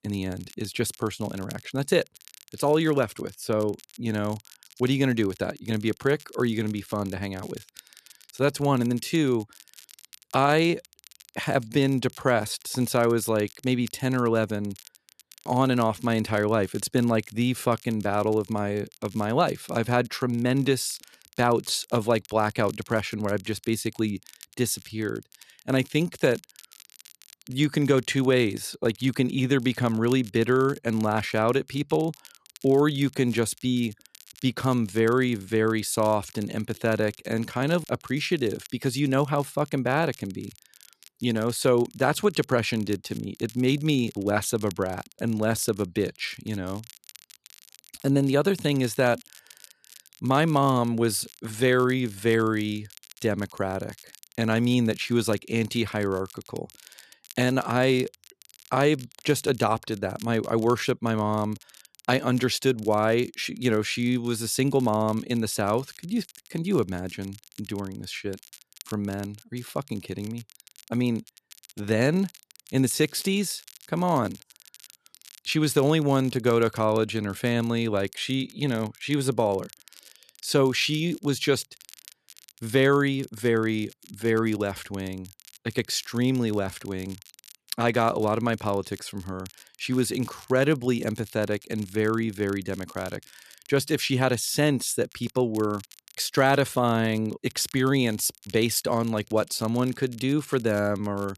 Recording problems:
crackle, like an old record; faint; 25 dB below the speech

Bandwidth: 13.5 kHz